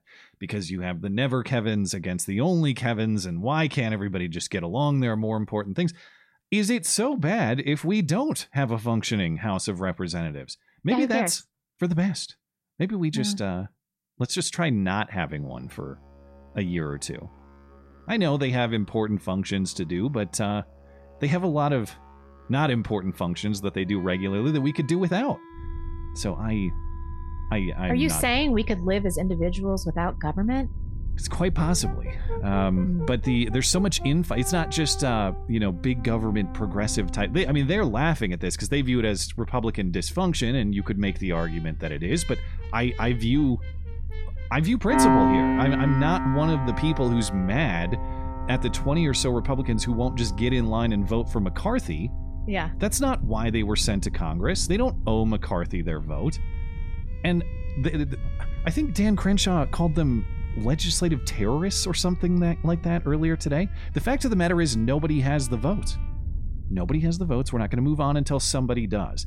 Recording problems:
background music; loud; from 15 s on; 6 dB below the speech
low rumble; faint; from 26 s on; 25 dB below the speech

